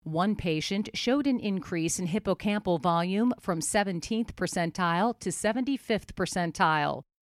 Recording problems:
none

